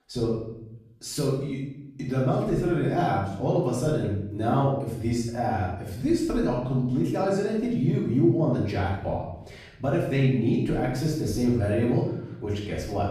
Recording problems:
off-mic speech; far
room echo; noticeable; dies away in 0.7 s

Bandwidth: 14.5 kHz